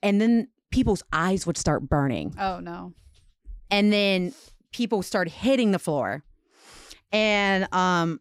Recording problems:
none

